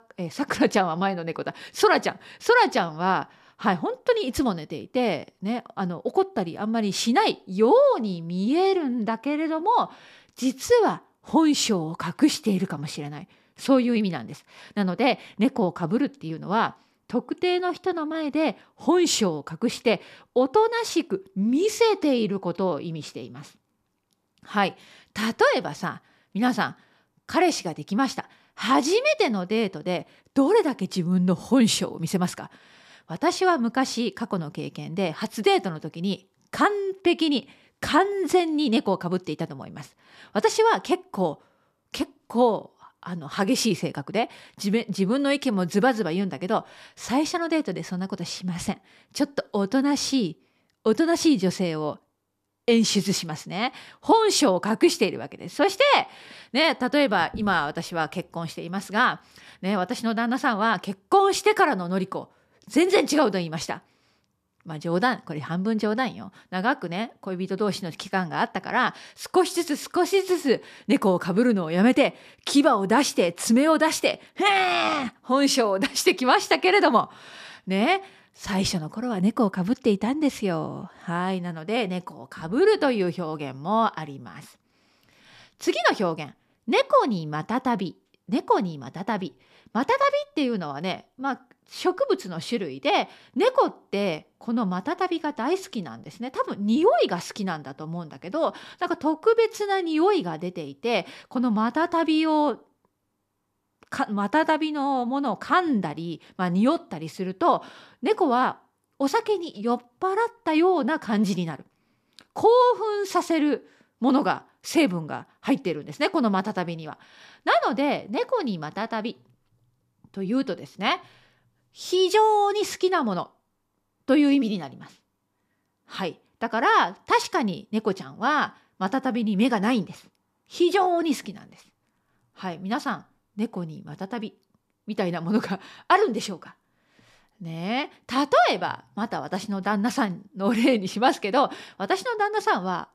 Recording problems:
none

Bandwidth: 14.5 kHz